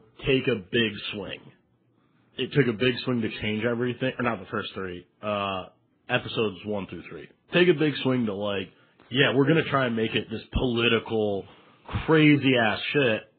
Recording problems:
garbled, watery; badly
high frequencies cut off; severe; nothing above 4 kHz

